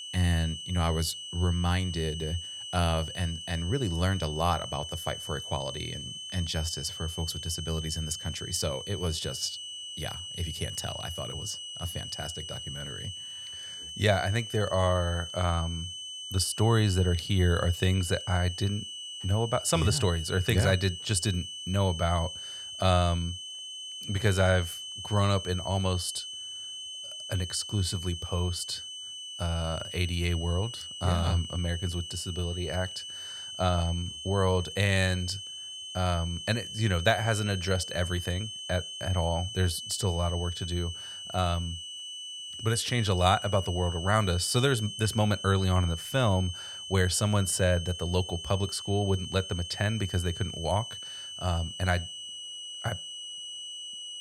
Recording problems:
high-pitched whine; loud; throughout; 3 kHz, 8 dB below the speech

